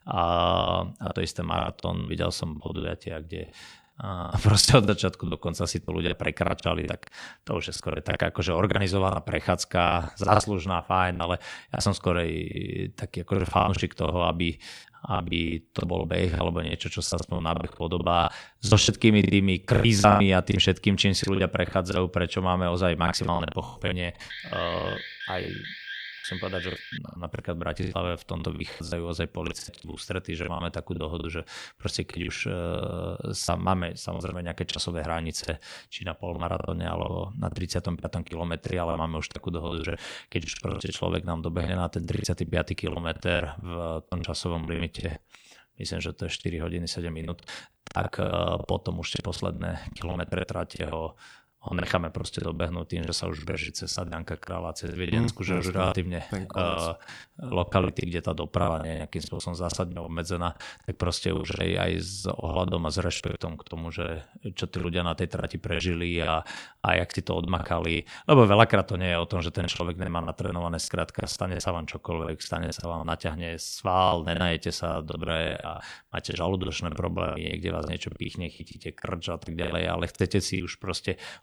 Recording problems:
choppy; very; 14% of the speech affected
alarm; noticeable; from 24 to 27 s; peak 8 dB below the speech

